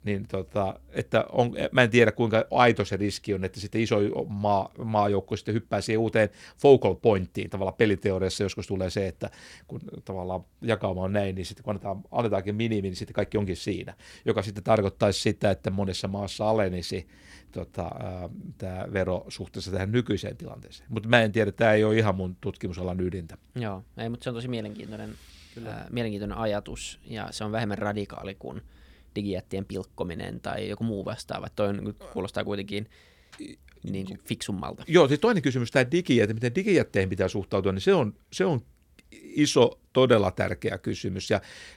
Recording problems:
none

